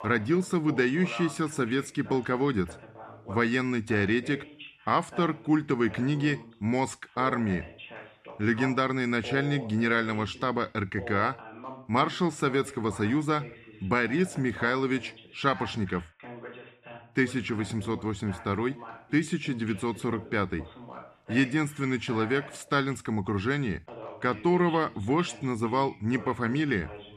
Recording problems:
voice in the background; noticeable; throughout; 15 dB below the speech

